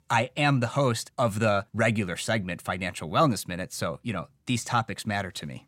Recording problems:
none

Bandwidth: 16 kHz